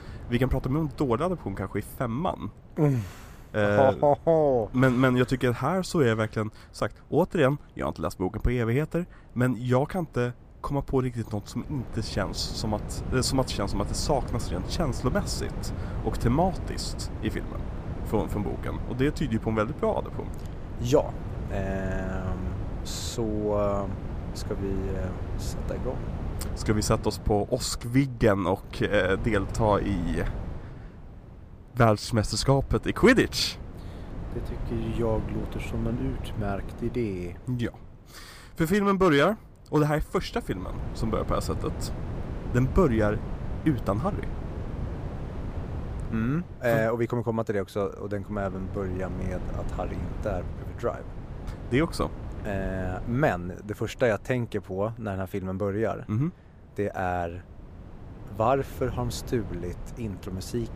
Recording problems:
wind noise on the microphone; occasional gusts; 15 dB below the speech

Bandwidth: 15 kHz